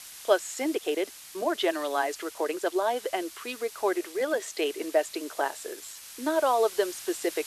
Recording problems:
thin; very; fading below 350 Hz
hiss; noticeable; throughout; 15 dB below the speech
uneven, jittery; strongly; from 0.5 to 6 s

